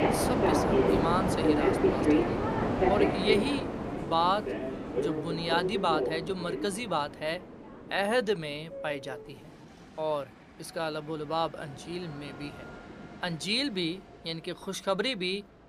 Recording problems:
train or aircraft noise; very loud; throughout; 3 dB above the speech

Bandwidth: 15 kHz